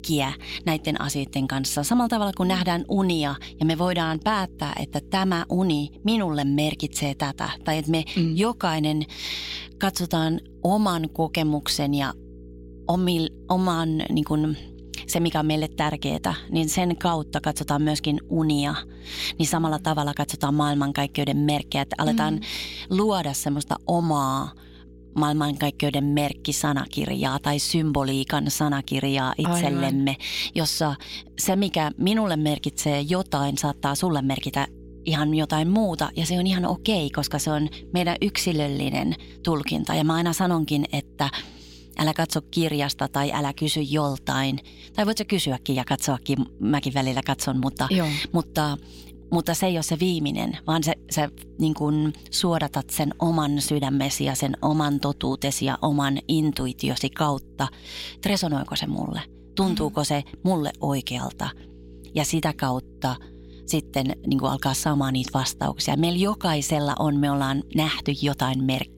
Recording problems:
electrical hum; faint; throughout; 60 Hz, 25 dB below the speech

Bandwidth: 16 kHz